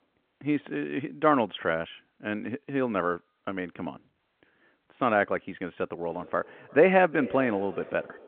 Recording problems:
echo of what is said; noticeable; from 6 s on; 360 ms later, 15 dB below the speech
phone-call audio

